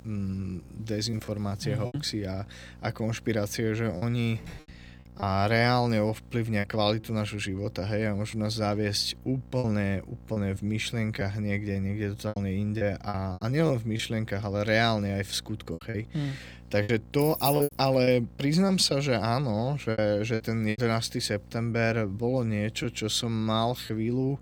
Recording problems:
electrical hum; faint; throughout; 60 Hz, 30 dB below the speech
choppy; very; 6% of the speech affected
door banging; faint; at 4.5 s; peak 20 dB below the speech
jangling keys; noticeable; at 17 s; peak 3 dB below the speech

